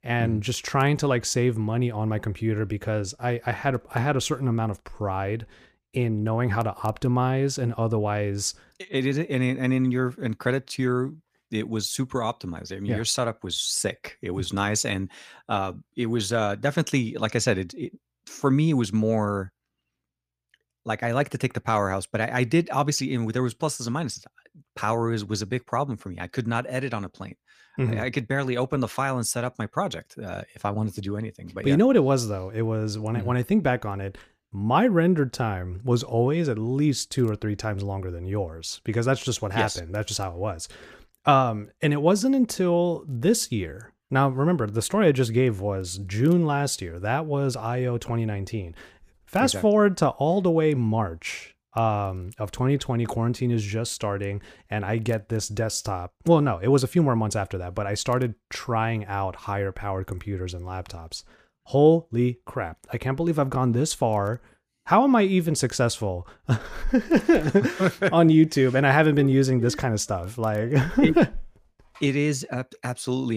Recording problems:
abrupt cut into speech; at the end

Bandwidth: 15 kHz